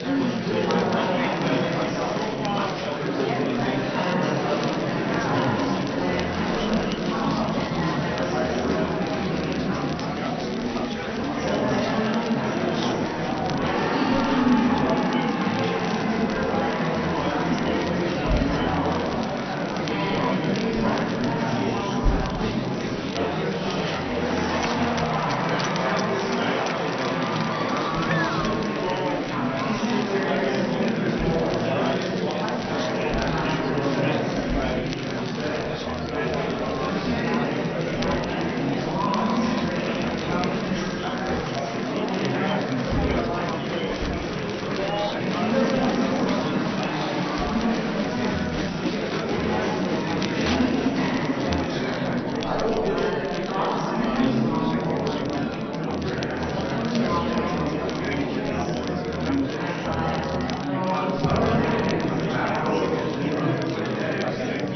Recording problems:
room echo; strong; dies away in 2.8 s
off-mic speech; far
high frequencies cut off; noticeable; nothing above 6 kHz
murmuring crowd; very loud; throughout; 4 dB above the speech
crackle, like an old record; noticeable; 10 dB below the speech

